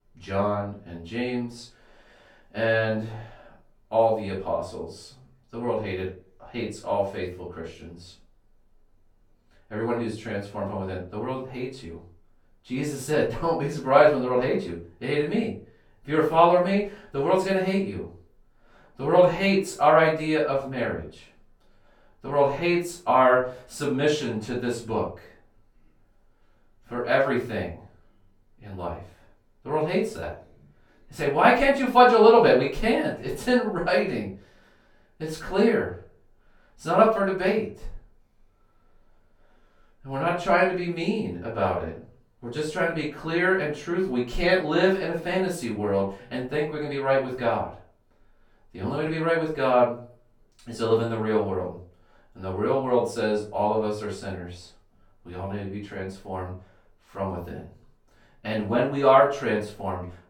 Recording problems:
off-mic speech; far
room echo; noticeable; dies away in 0.3 s

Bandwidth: 18 kHz